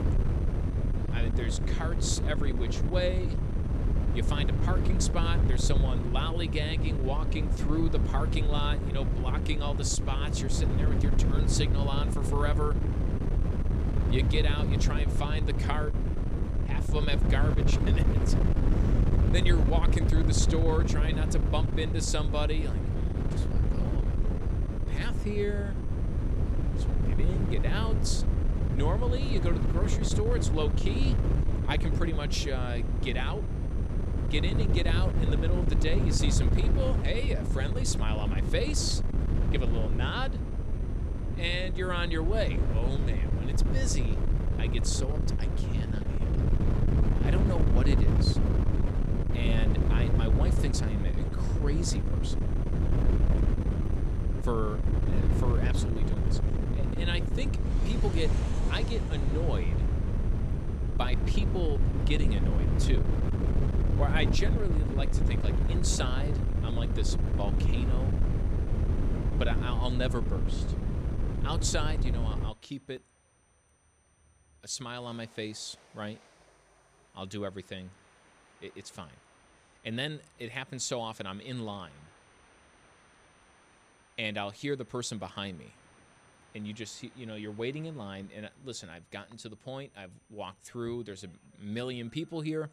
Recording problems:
wind noise on the microphone; heavy; until 1:12; 3 dB below the speech
train or aircraft noise; noticeable; from 58 s on; 20 dB below the speech
high-pitched whine; faint; throughout; 9 kHz, 35 dB below the speech

